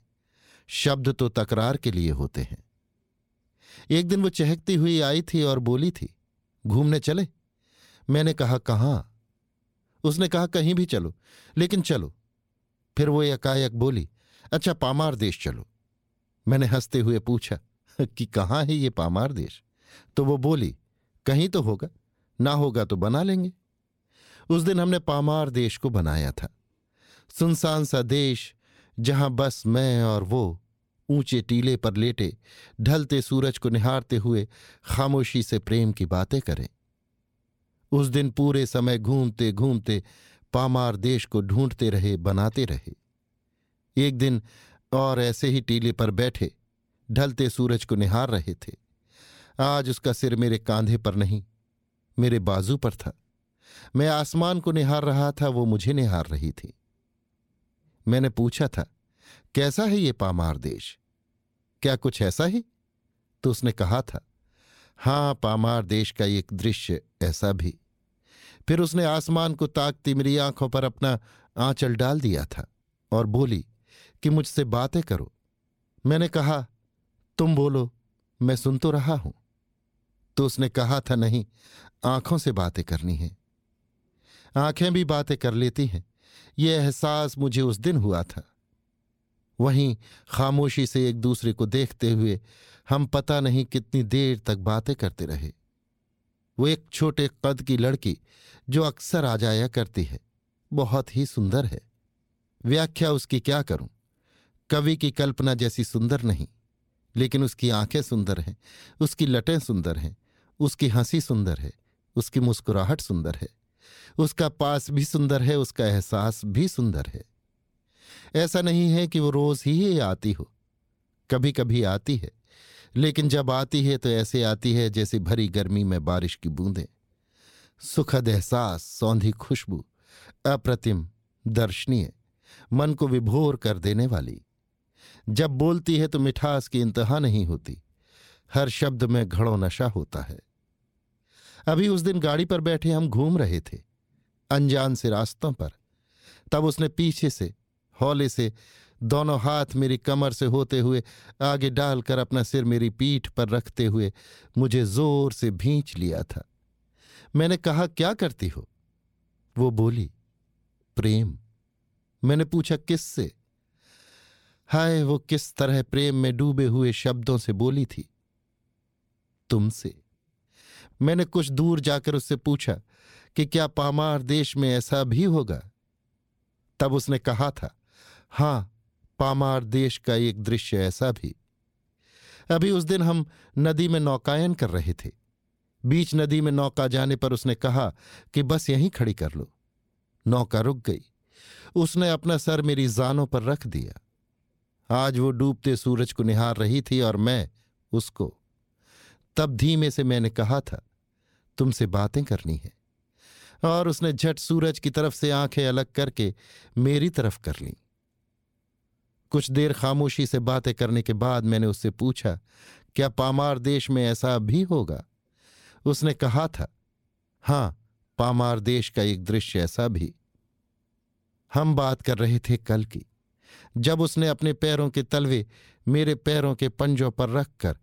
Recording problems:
none

